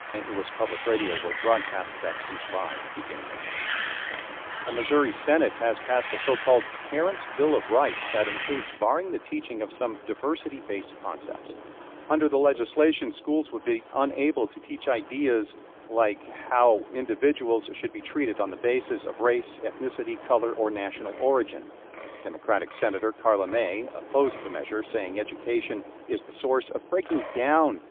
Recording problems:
phone-call audio; poor line; nothing above 3.5 kHz
wind in the background; loud; throughout; 10 dB below the speech

